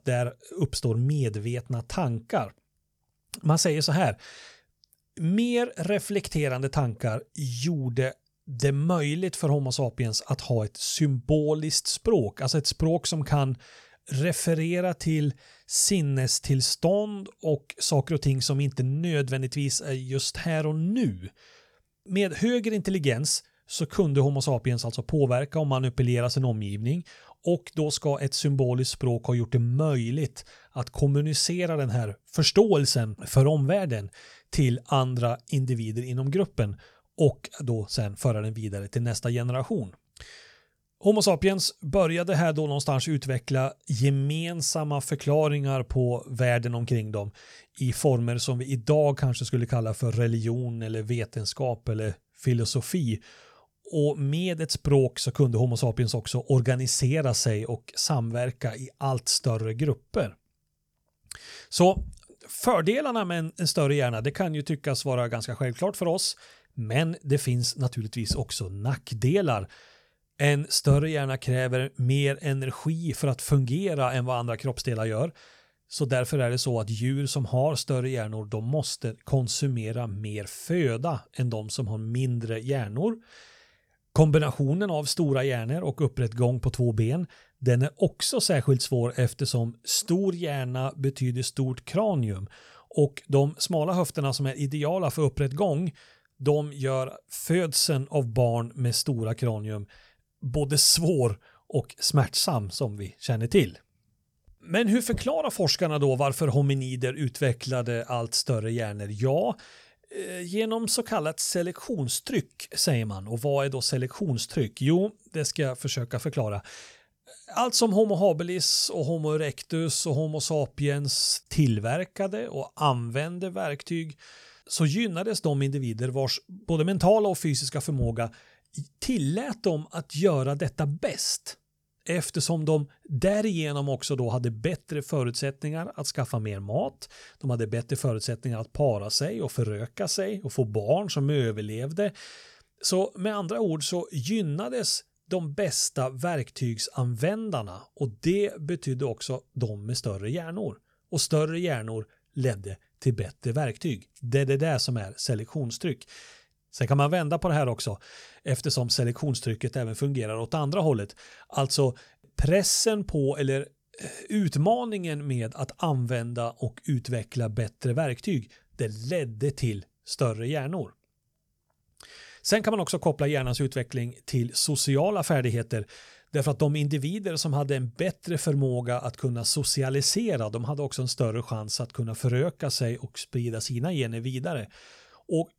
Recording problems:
none

